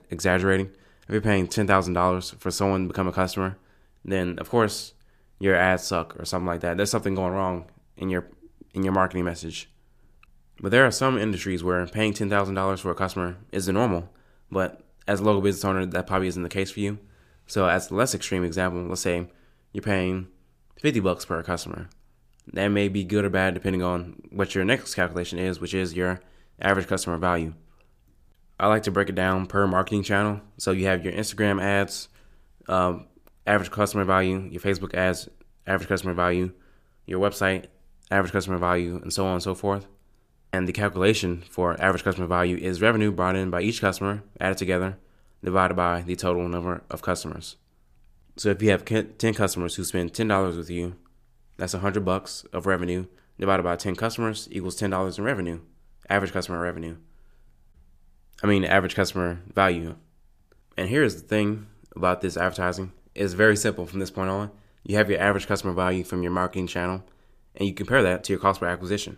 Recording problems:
none

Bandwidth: 15 kHz